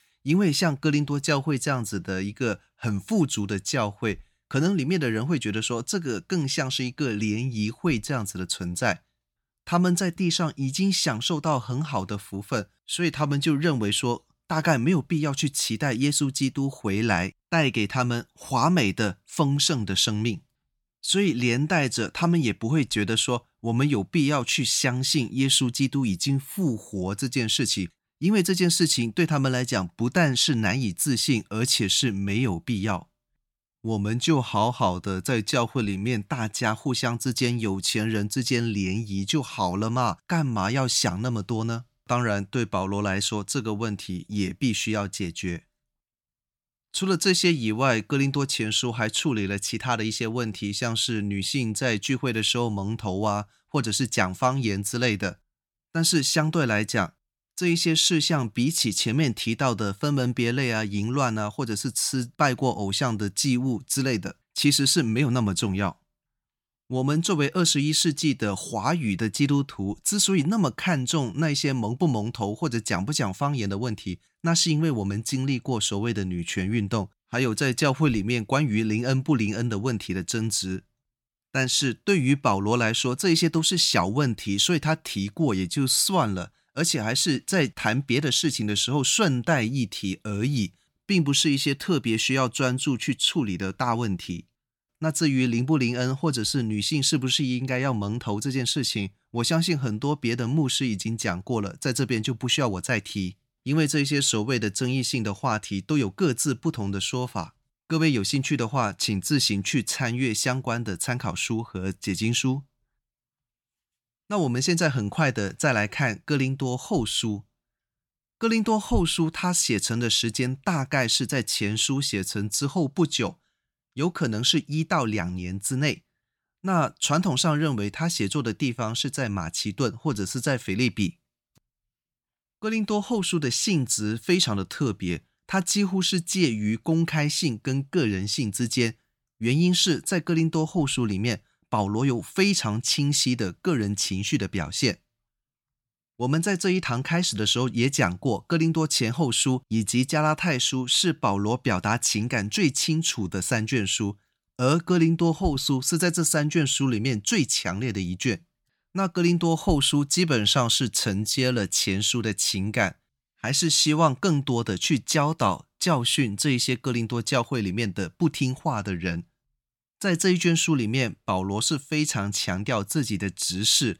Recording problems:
none

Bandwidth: 17 kHz